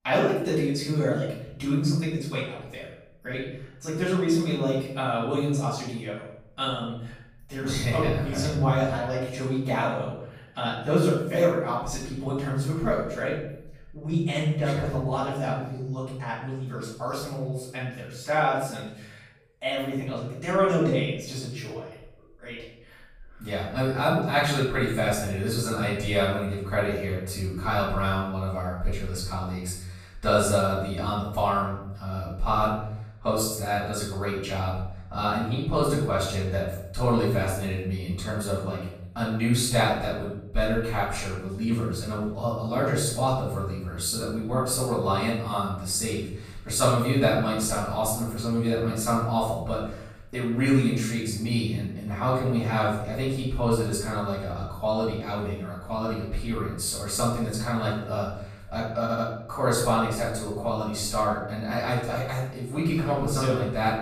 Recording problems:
off-mic speech; far
room echo; noticeable; dies away in 0.7 s
audio stuttering; at 59 s

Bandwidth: 15 kHz